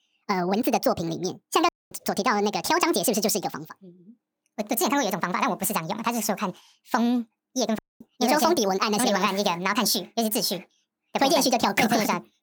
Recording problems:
wrong speed and pitch; too fast and too high; 1.7 times normal speed
audio cutting out; at 1.5 s and at 8 s

